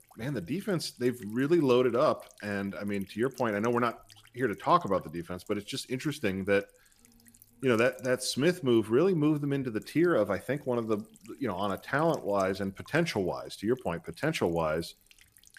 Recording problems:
electrical hum; faint; throughout; 50 Hz, 30 dB below the speech

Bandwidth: 14.5 kHz